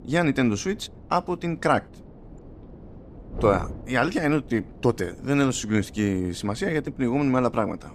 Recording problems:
wind noise on the microphone; occasional gusts; 20 dB below the speech

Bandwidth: 14.5 kHz